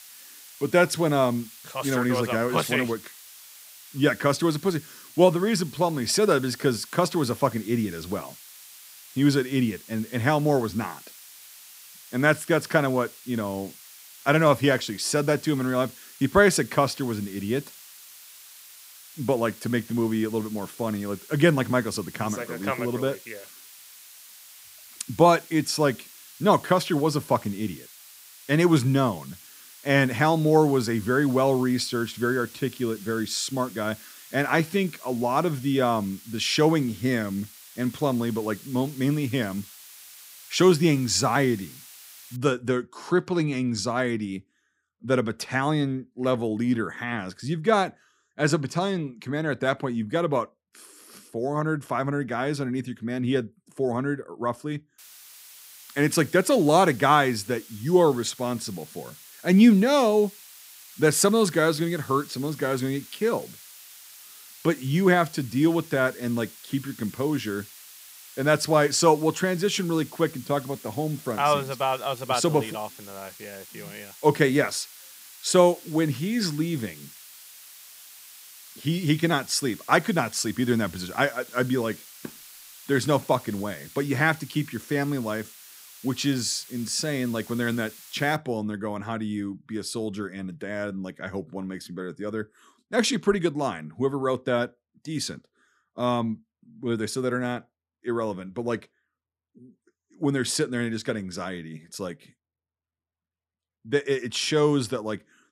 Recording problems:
hiss; noticeable; until 42 s and from 55 s to 1:28; 20 dB below the speech

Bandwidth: 15.5 kHz